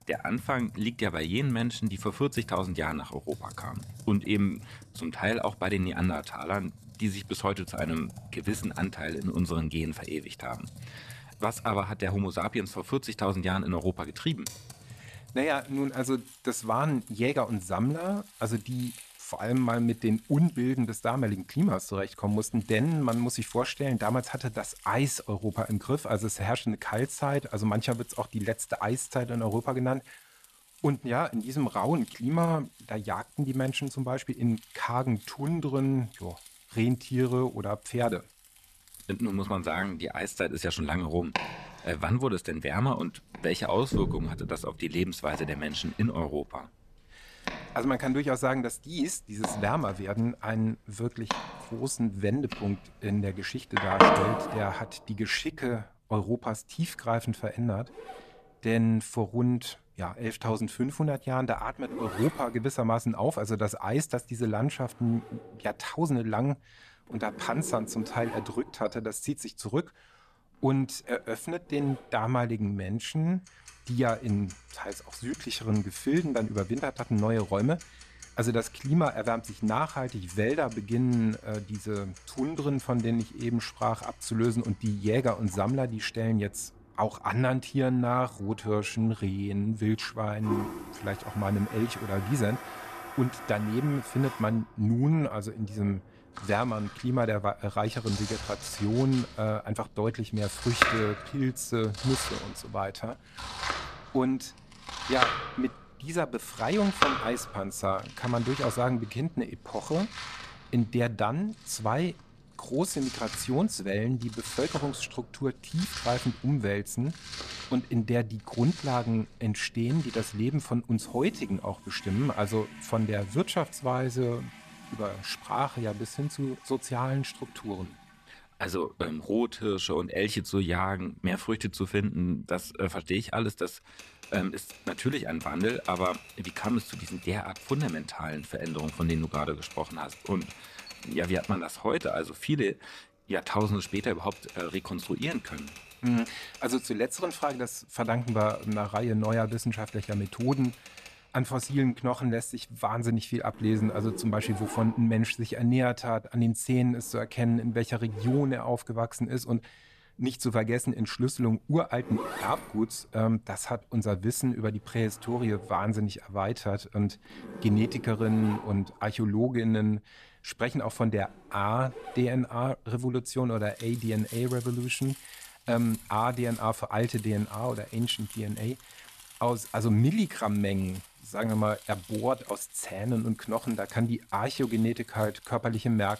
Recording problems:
household noises; loud; throughout; 9 dB below the speech

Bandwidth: 14 kHz